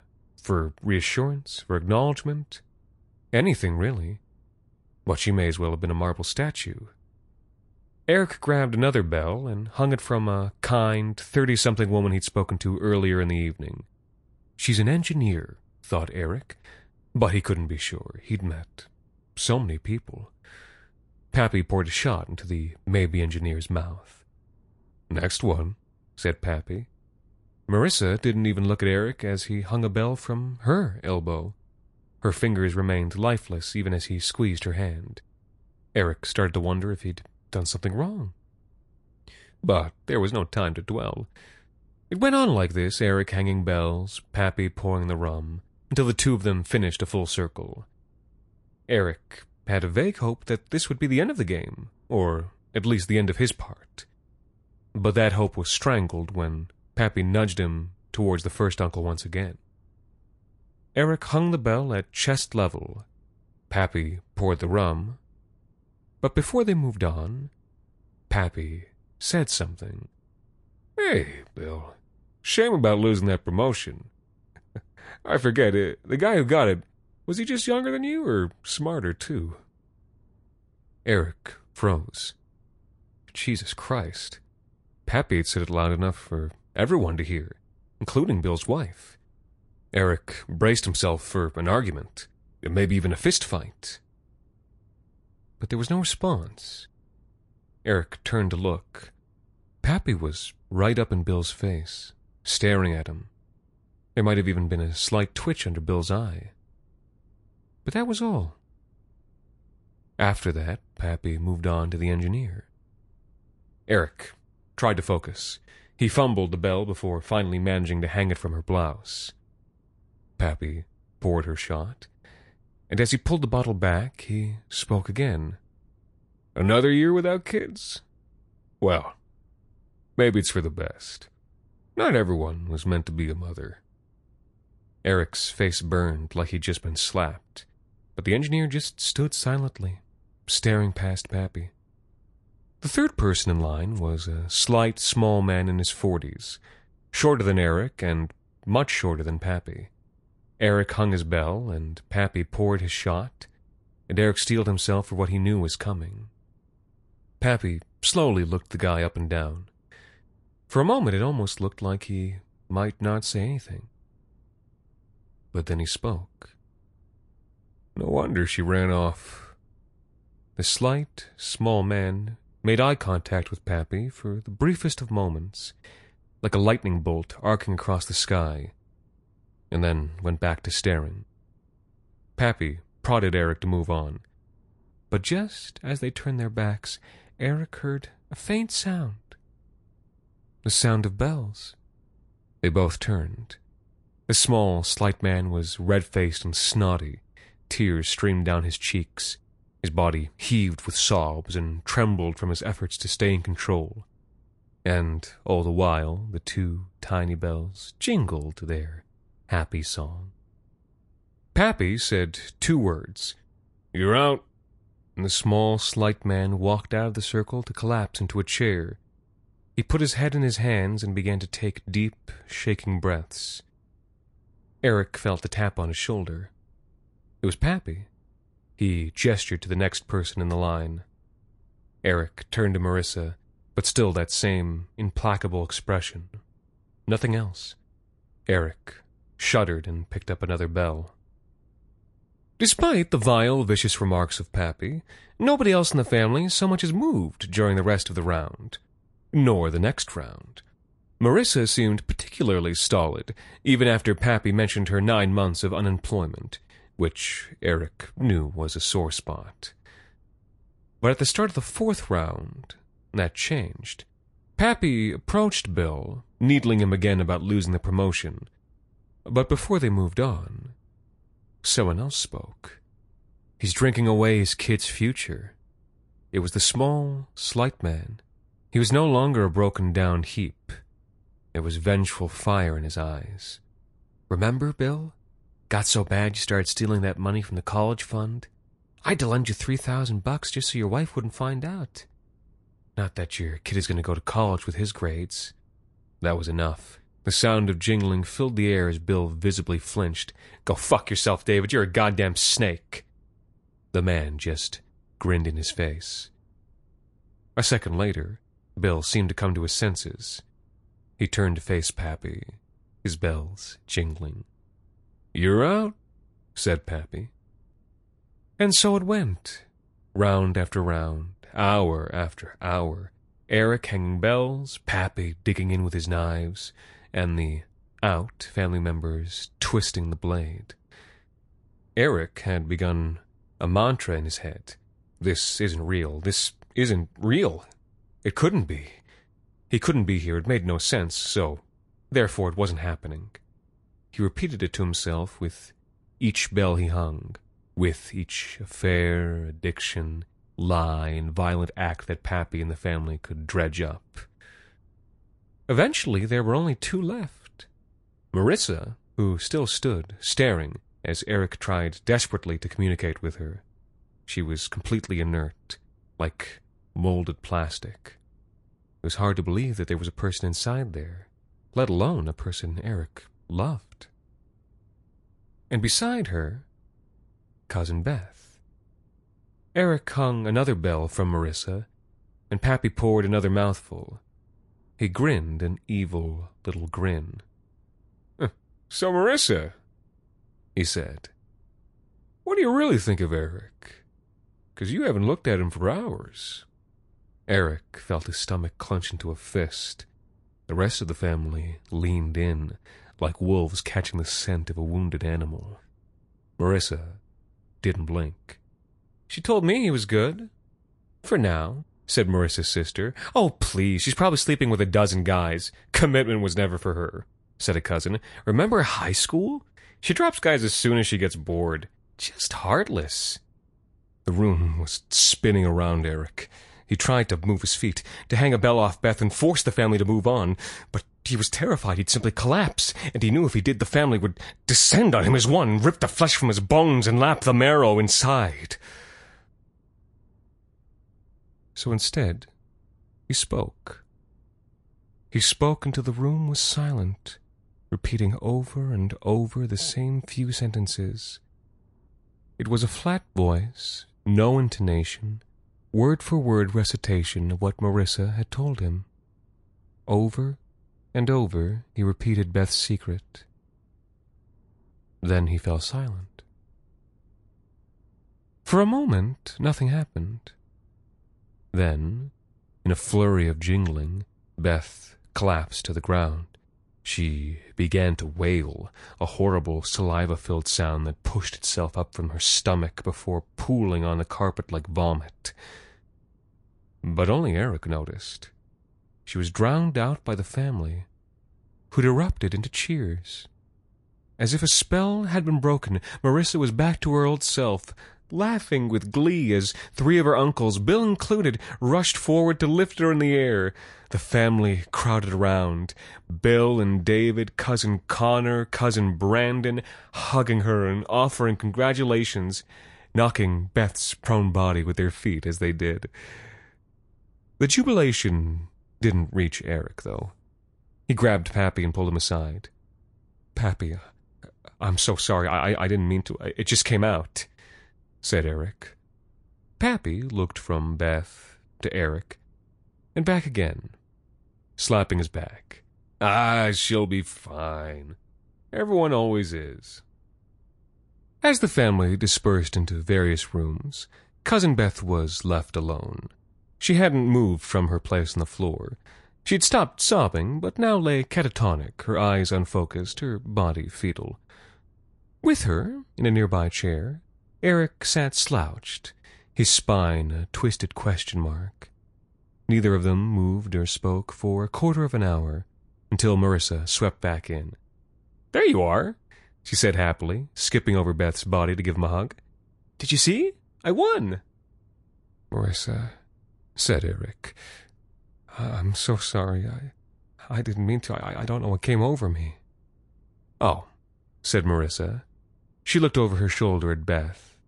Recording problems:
garbled, watery; slightly; nothing above 11 kHz

